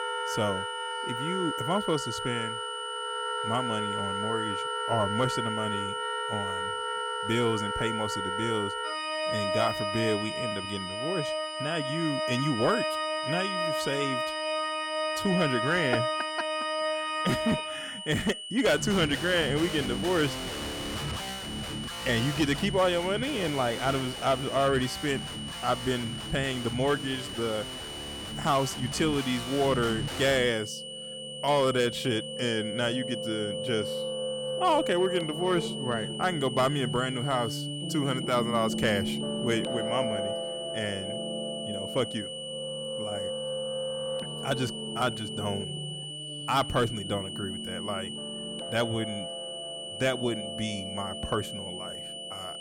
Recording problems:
high-pitched whine; loud; throughout; 3 kHz, 7 dB below the speech
background music; loud; throughout; 4 dB below the speech

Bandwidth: 18 kHz